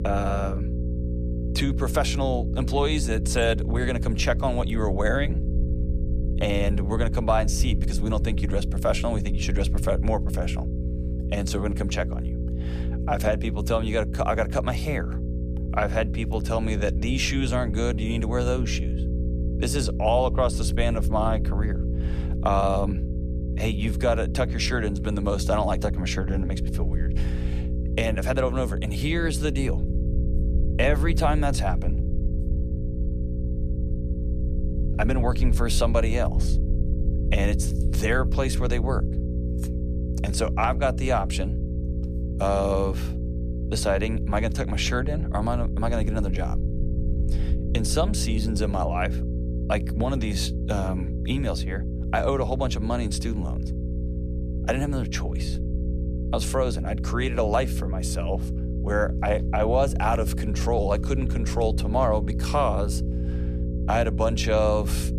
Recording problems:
electrical hum; noticeable; throughout; 60 Hz, 10 dB below the speech
low rumble; faint; throughout; 25 dB below the speech

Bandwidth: 14.5 kHz